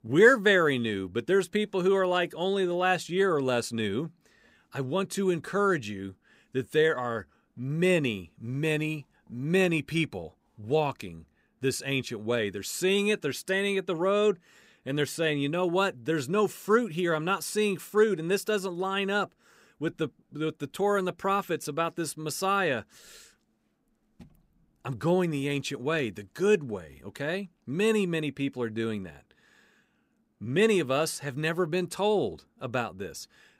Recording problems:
none

